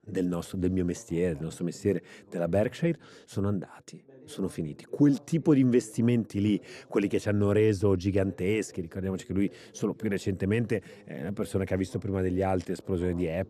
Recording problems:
muffled; slightly; fading above 1.5 kHz
voice in the background; faint; throughout; 25 dB below the speech

